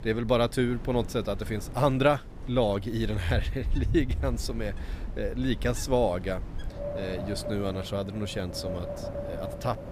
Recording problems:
wind in the background; loud; throughout; 8 dB below the speech

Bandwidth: 15 kHz